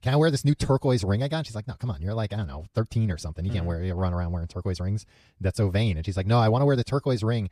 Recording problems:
wrong speed, natural pitch; too fast; 1.5 times normal speed

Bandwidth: 14.5 kHz